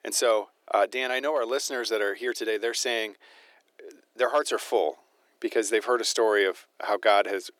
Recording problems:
thin; very; fading below 350 Hz

